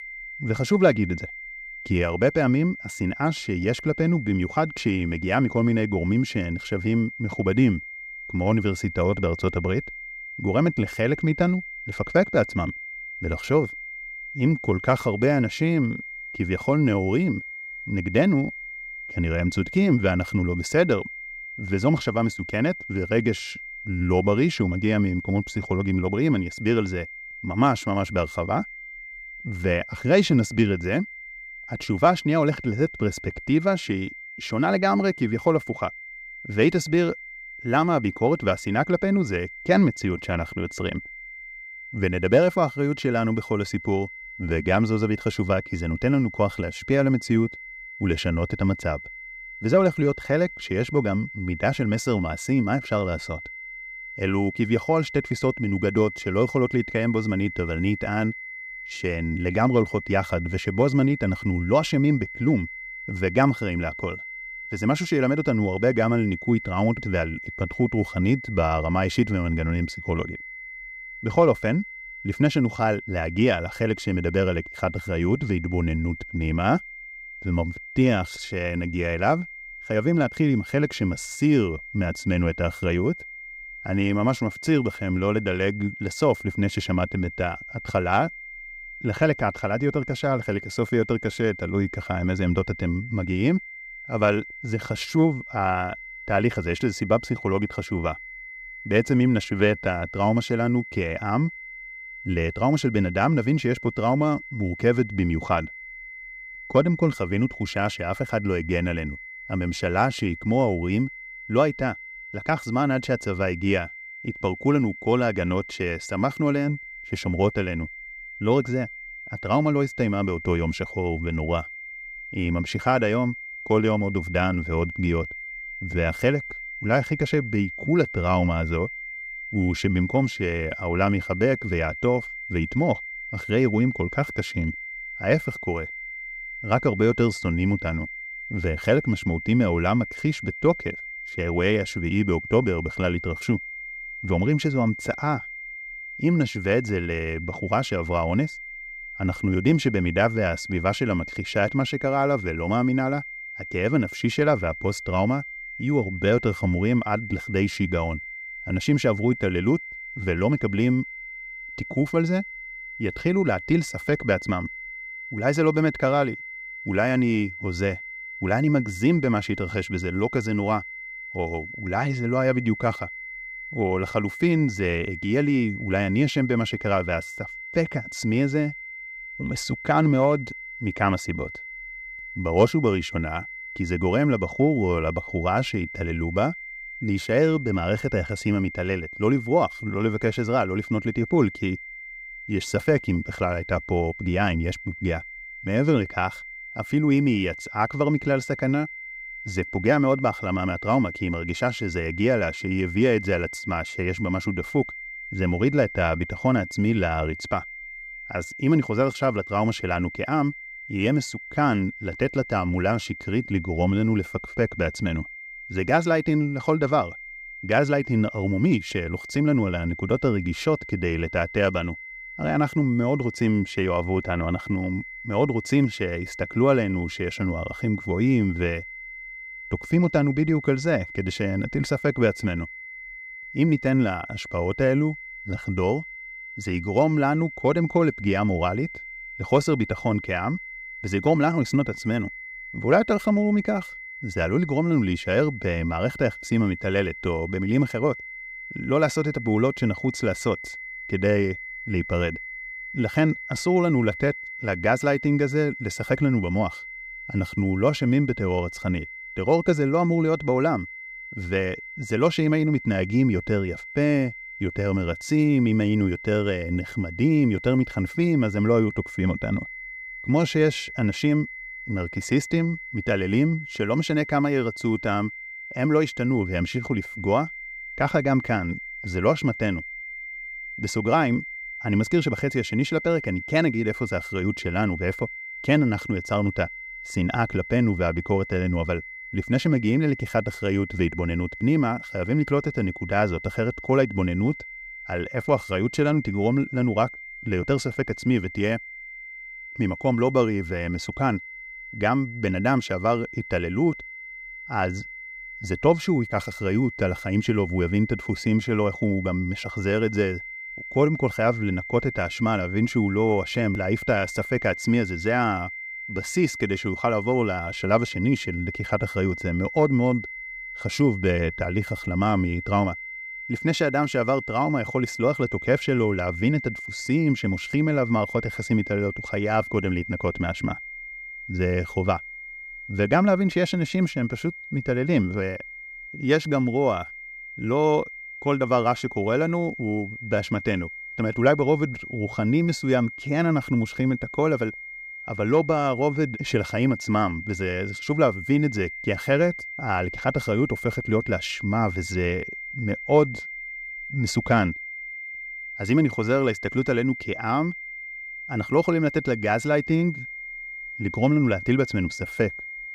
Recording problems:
high-pitched whine; noticeable; throughout; 2 kHz, 10 dB below the speech

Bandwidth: 15.5 kHz